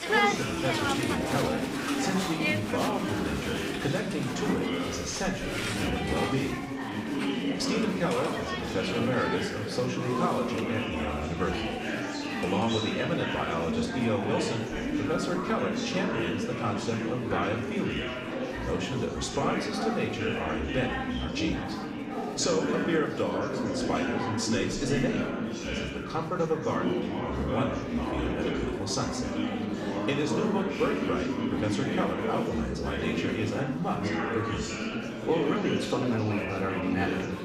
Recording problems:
room echo; slight; dies away in 0.6 s
off-mic speech; somewhat distant
chatter from many people; very loud; throughout; as loud as the speech

